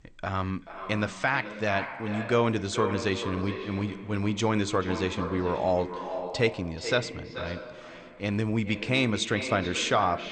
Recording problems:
echo of what is said; strong; throughout; 430 ms later, 9 dB below the speech
garbled, watery; slightly; nothing above 8.5 kHz

